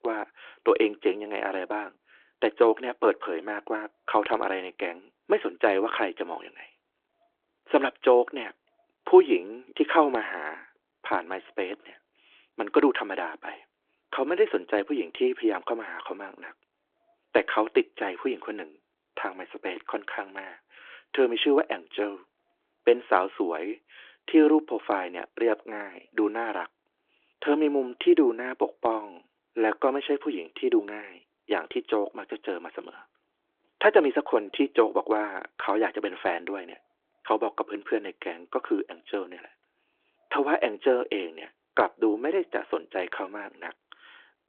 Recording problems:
phone-call audio

